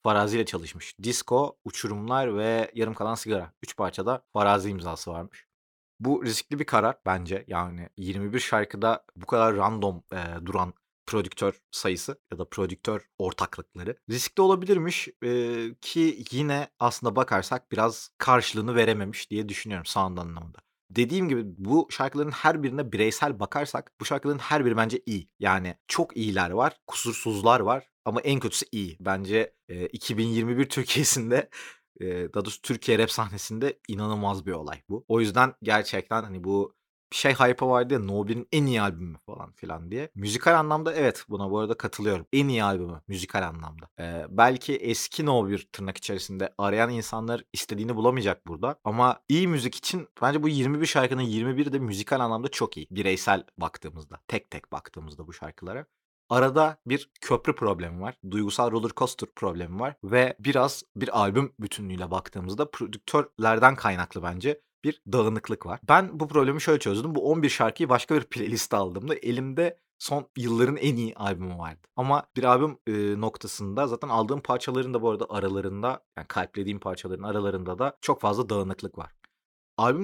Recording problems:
abrupt cut into speech; at the end

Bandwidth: 17.5 kHz